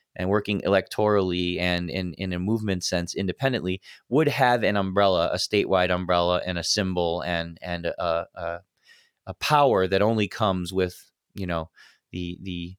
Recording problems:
none

